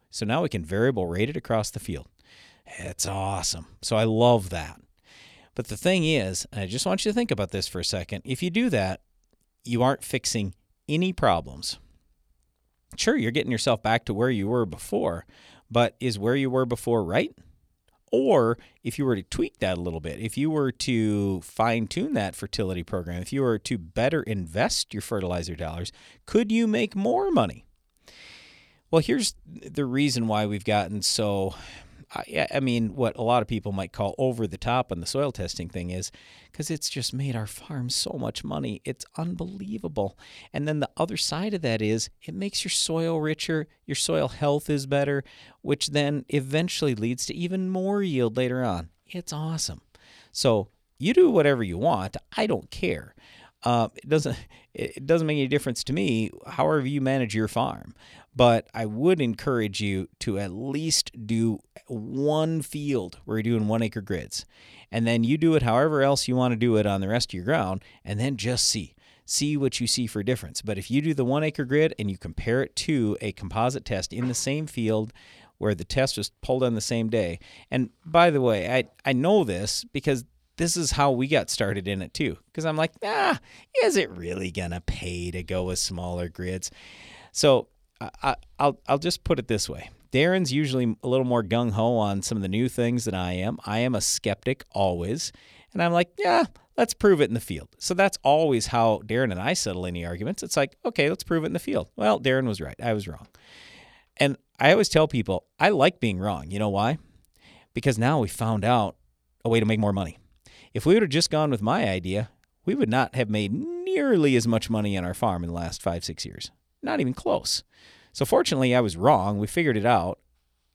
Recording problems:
uneven, jittery; strongly; from 2.5 s to 1:50

